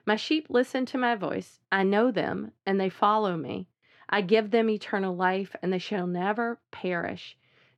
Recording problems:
muffled; slightly; fading above 3.5 kHz

